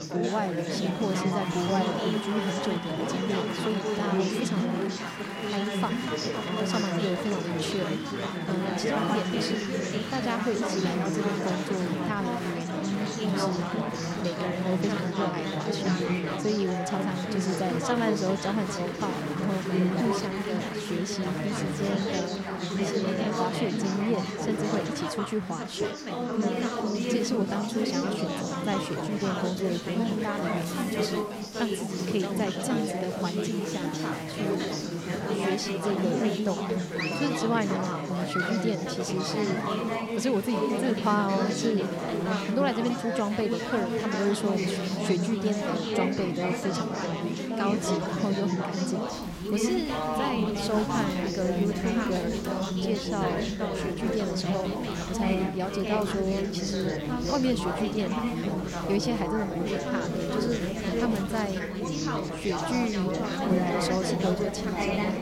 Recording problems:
chatter from many people; very loud; throughout; 2 dB above the speech

